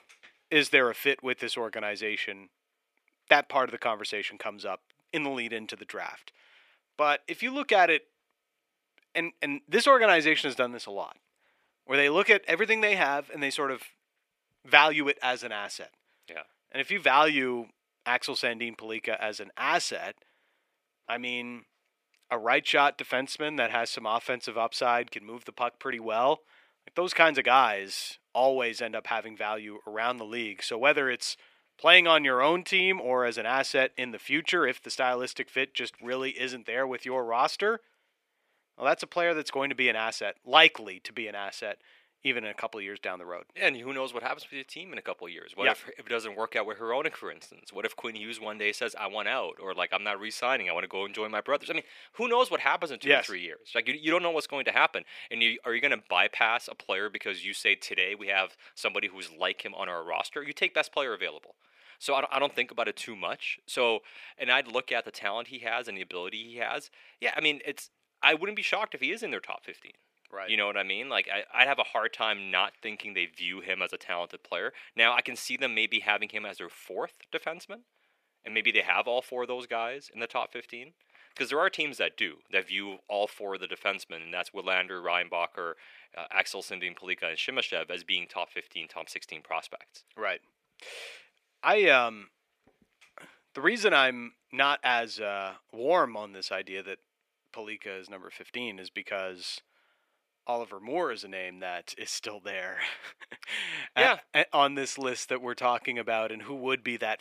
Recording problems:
thin; somewhat; fading below 500 Hz

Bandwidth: 14.5 kHz